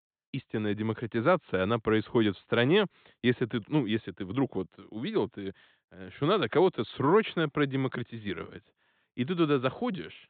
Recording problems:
high frequencies cut off; severe; nothing above 4 kHz

